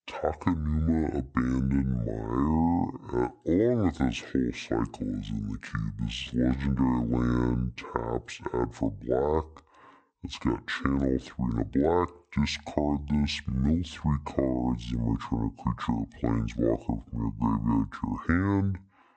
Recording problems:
wrong speed and pitch; too slow and too low; 0.6 times normal speed

